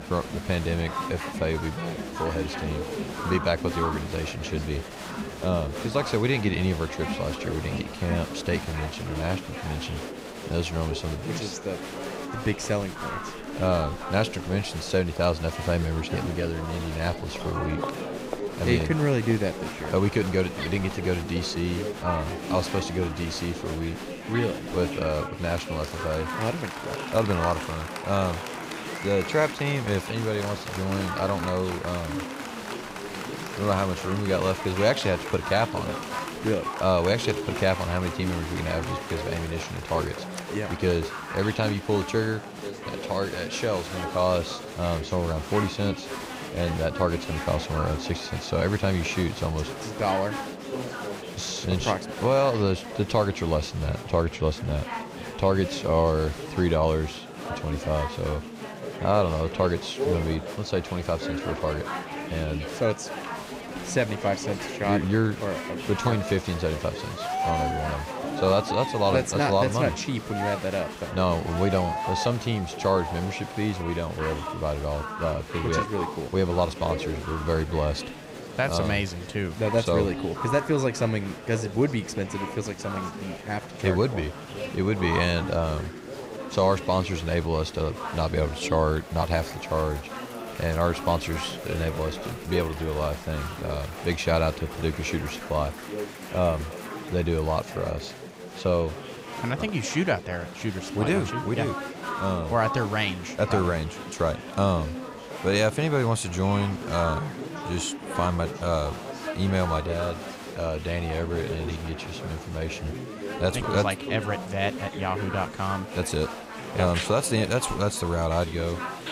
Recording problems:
chatter from many people; loud; throughout; 7 dB below the speech

